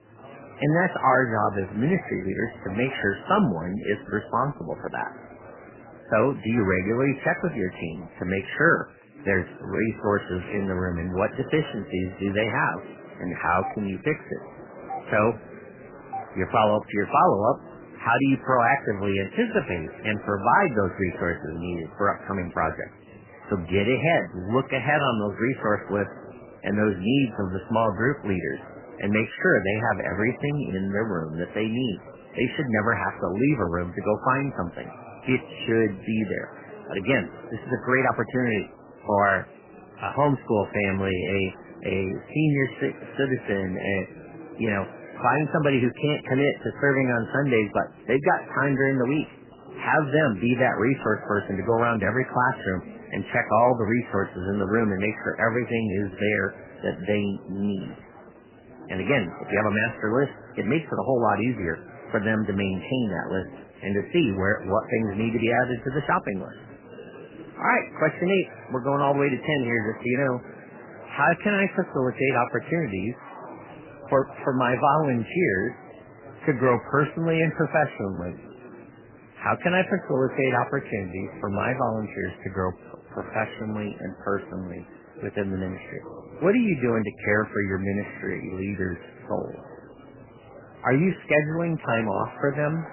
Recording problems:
garbled, watery; badly; nothing above 3 kHz
murmuring crowd; noticeable; throughout; 20 dB below the speech
doorbell; faint; from 14 to 16 s; peak 10 dB below the speech

